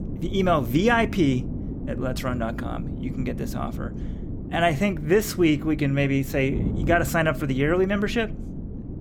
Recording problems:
wind noise on the microphone; occasional gusts; 15 dB below the speech

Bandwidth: 17.5 kHz